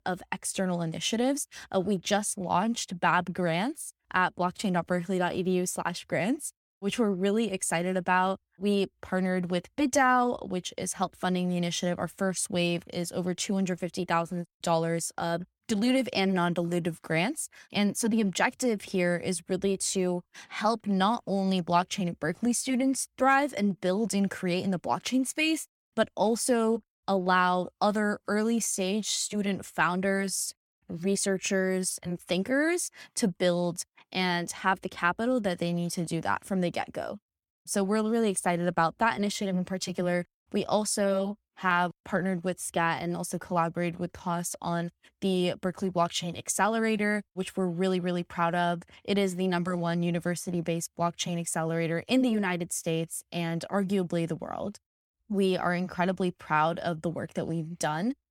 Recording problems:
none

